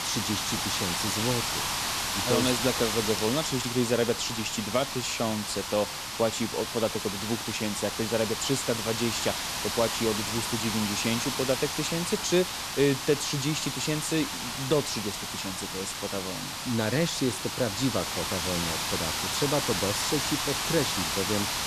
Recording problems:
hiss; loud; throughout; as loud as the speech

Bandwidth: 14 kHz